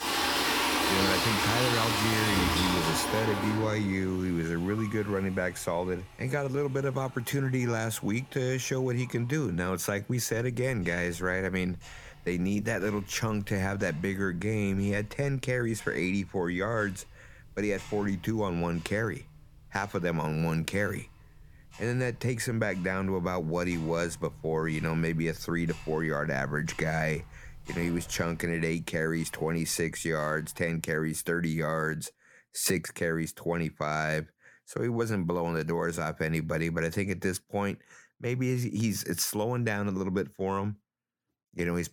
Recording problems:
household noises; very loud; until 31 s; 2 dB above the speech

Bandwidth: 18.5 kHz